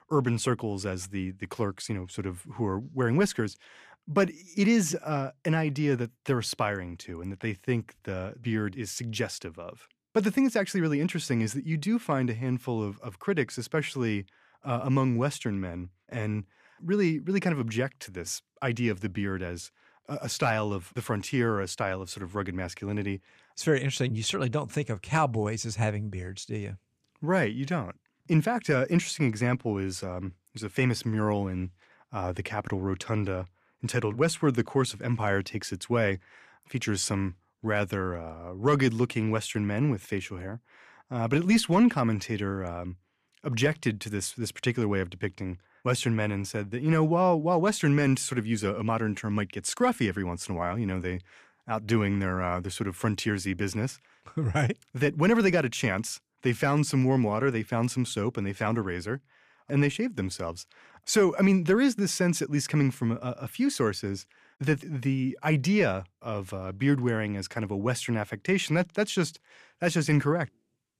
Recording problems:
none

